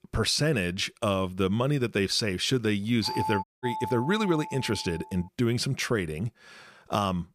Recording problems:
doorbell; noticeable; from 3 to 5 s; peak 4 dB below the speech
audio cutting out; at 3.5 s

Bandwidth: 15 kHz